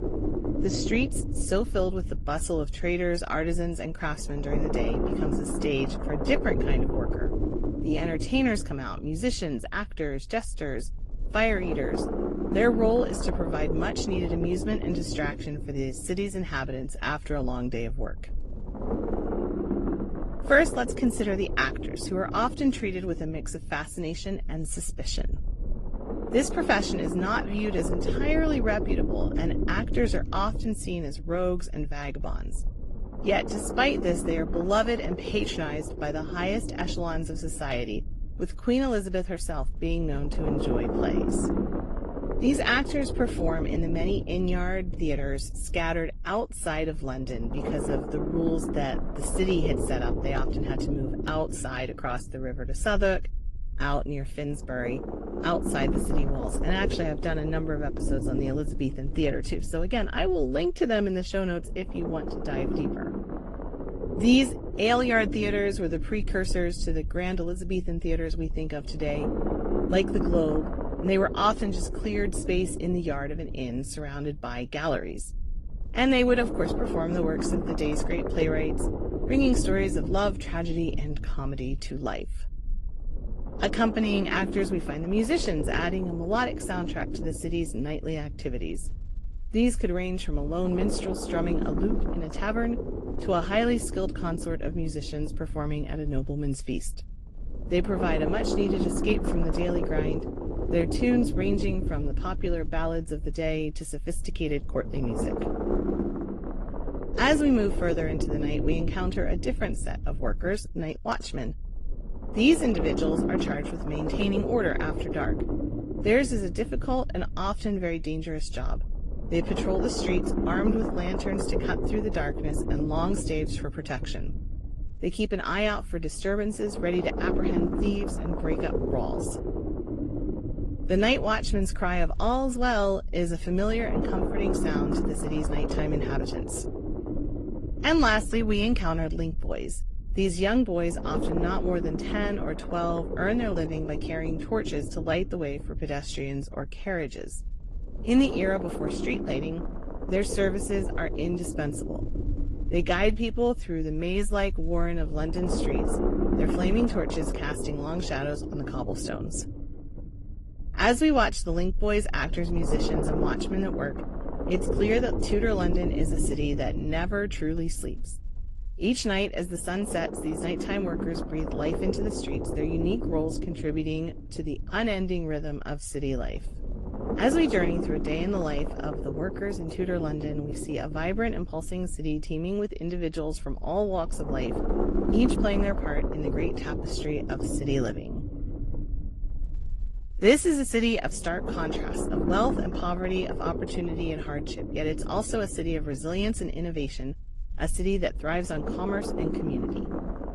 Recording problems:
garbled, watery; slightly; nothing above 10.5 kHz
low rumble; loud; throughout; 5 dB below the speech

